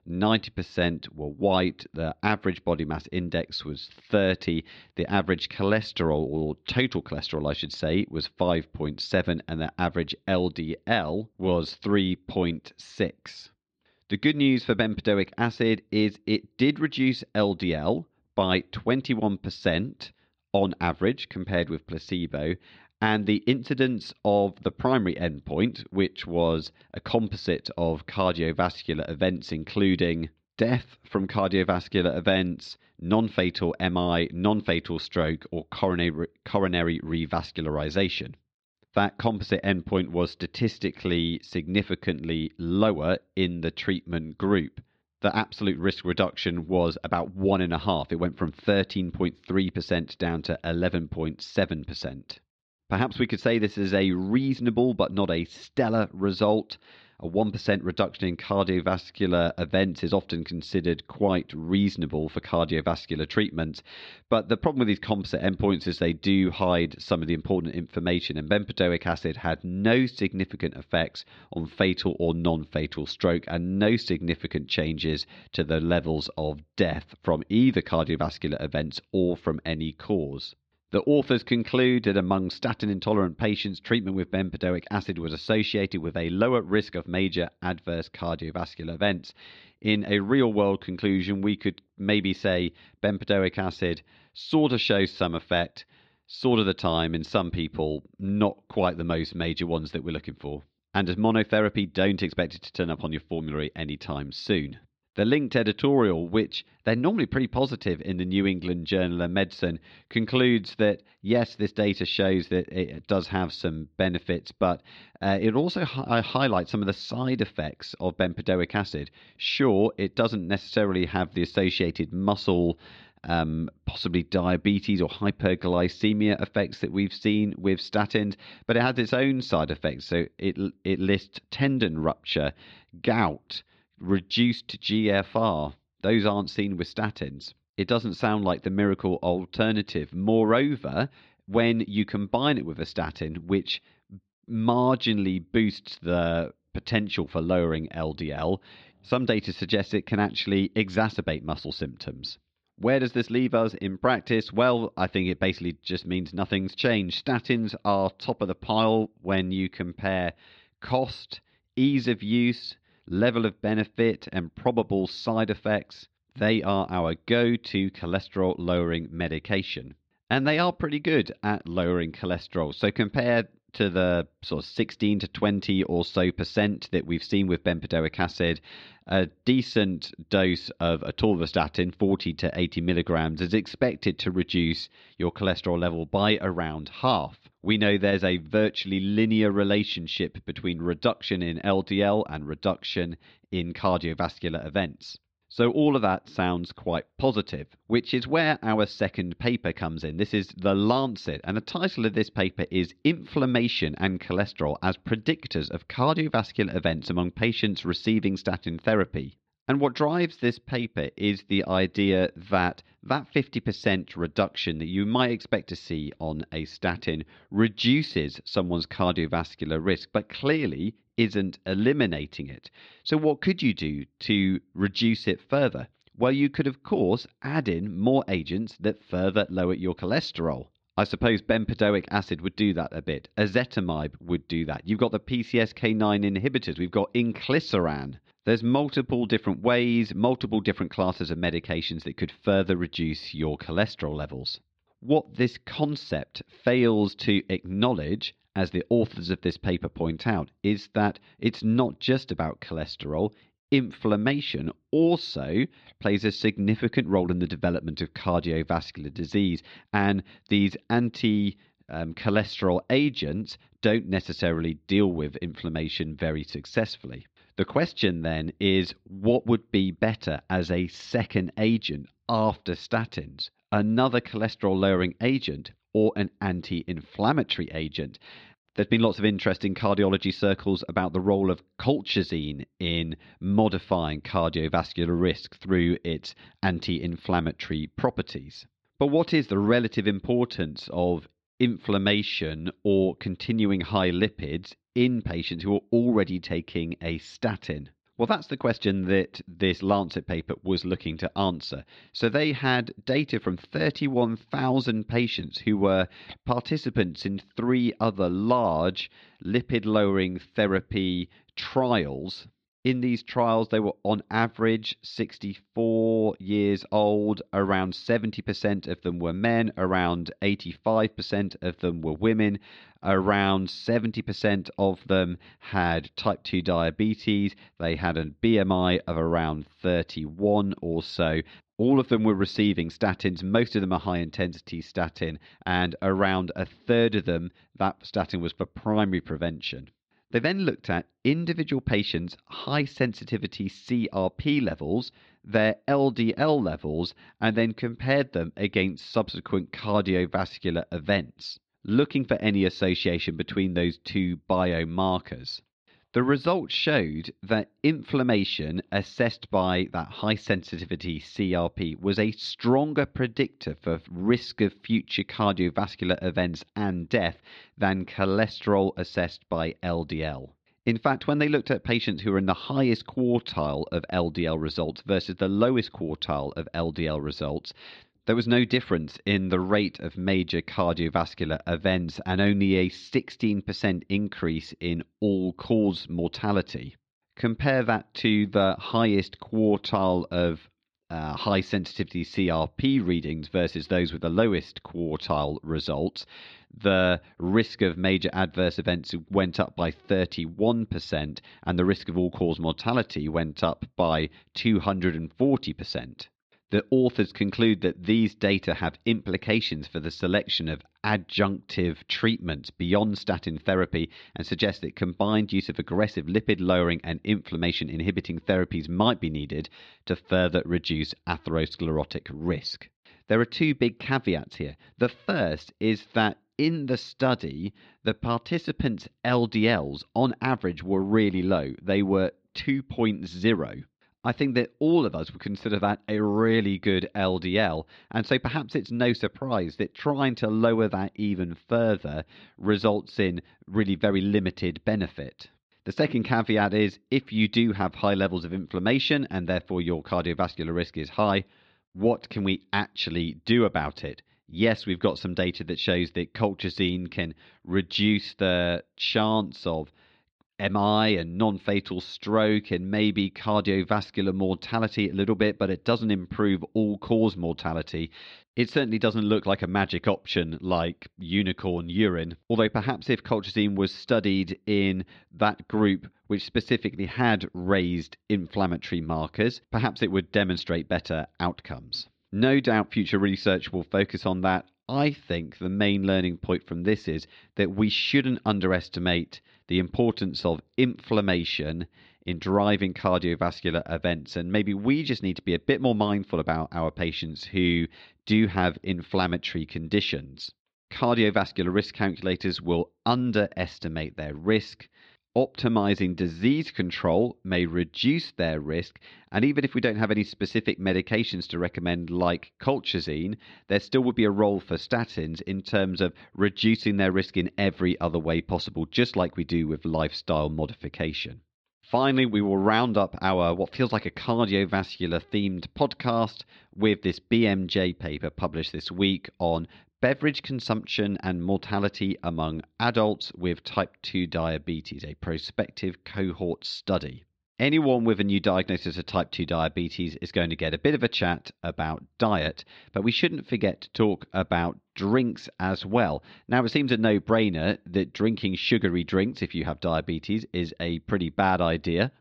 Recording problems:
muffled; slightly; fading above 4 kHz

